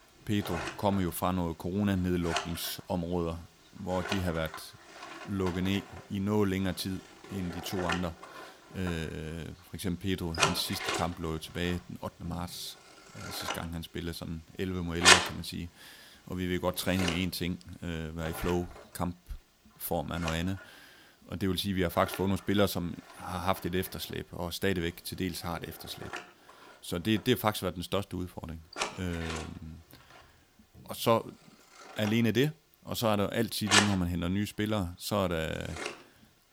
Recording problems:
household noises; very loud; throughout; 1 dB above the speech

